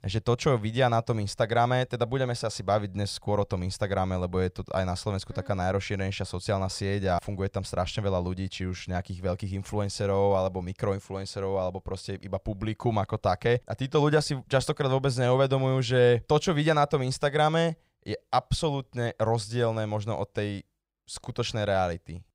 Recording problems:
none

